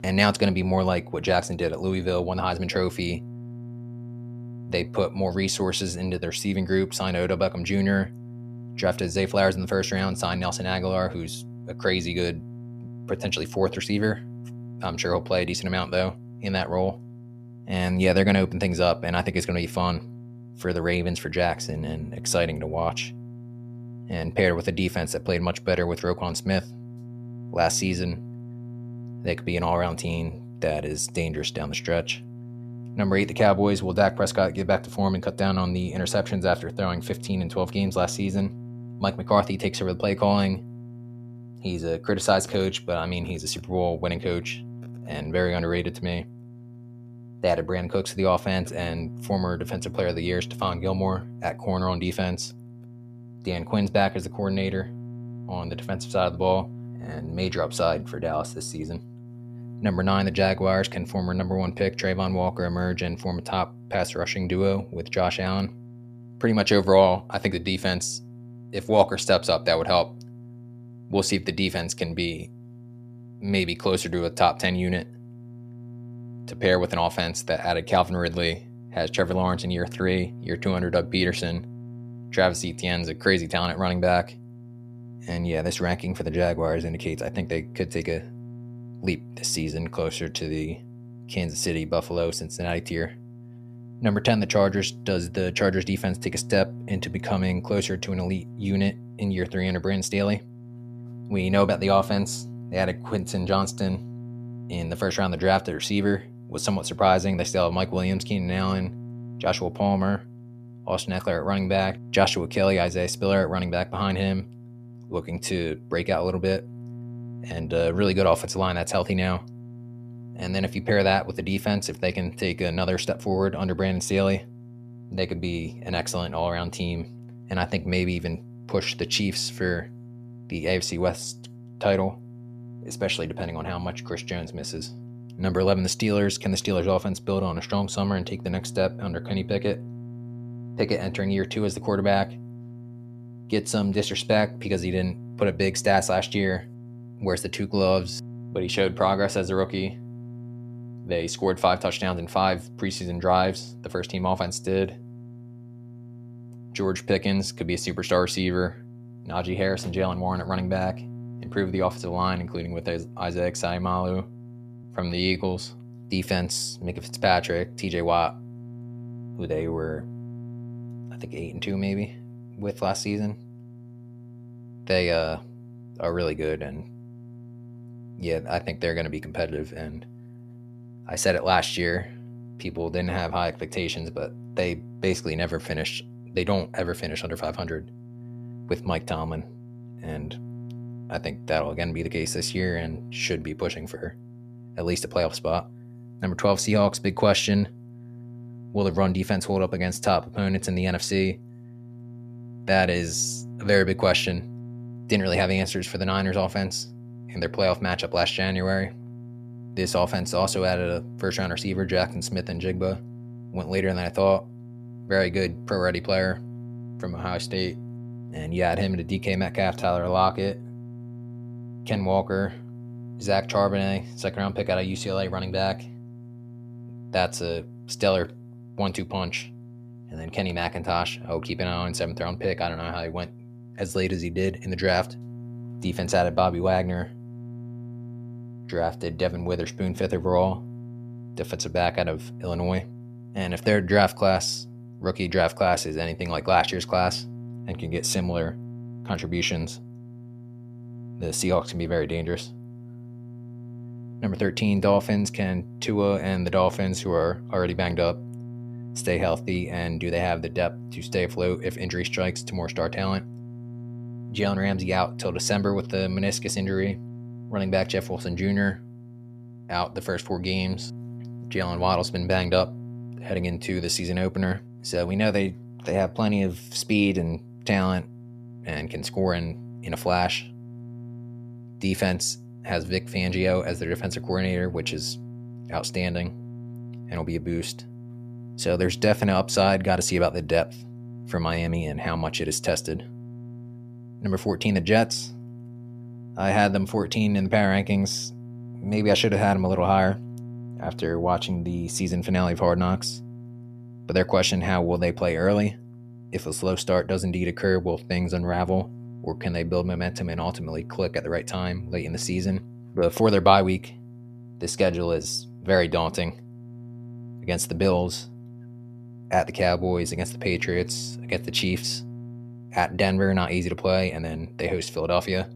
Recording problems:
electrical hum; faint; throughout; 60 Hz, 20 dB below the speech
uneven, jittery; slightly; from 1:40 to 3:40

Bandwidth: 14.5 kHz